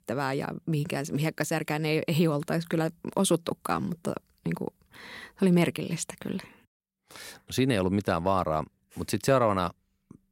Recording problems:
none

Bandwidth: 16 kHz